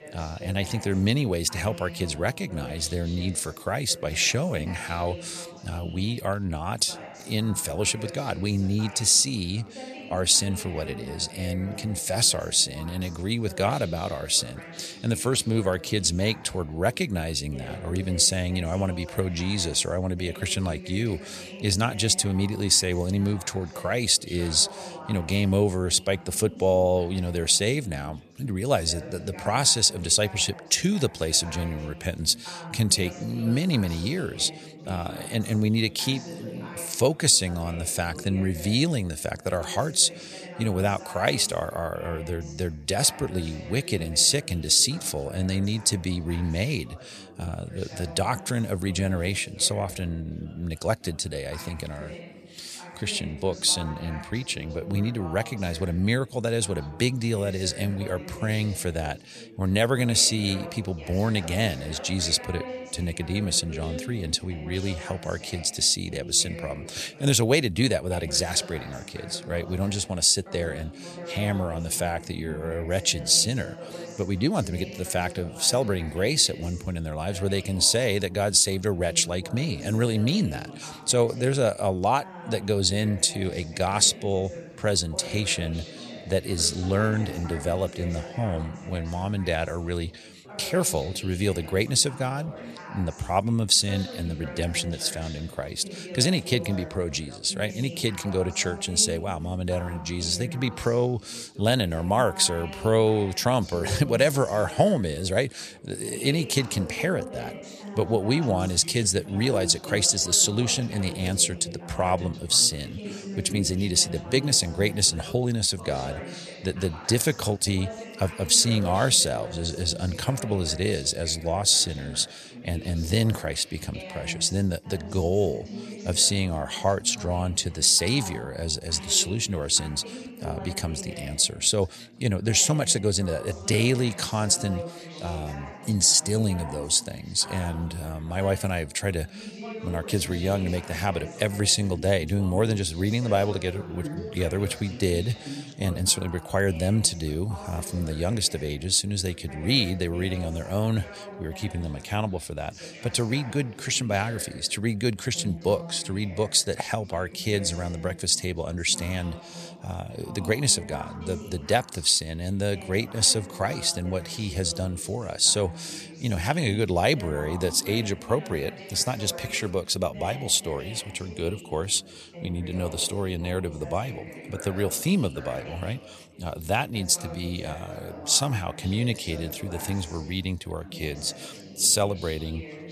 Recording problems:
chatter from many people; noticeable; throughout; 15 dB below the speech

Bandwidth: 14 kHz